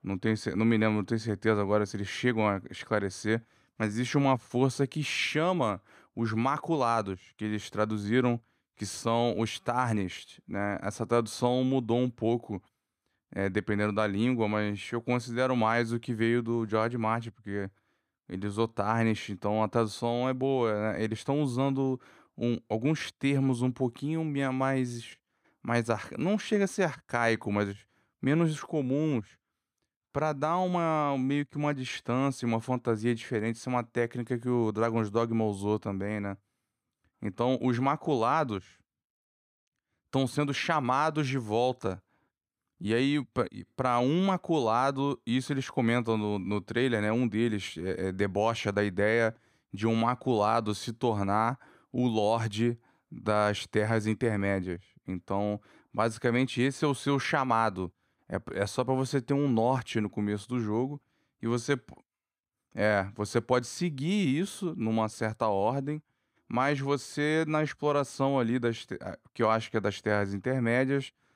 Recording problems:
none

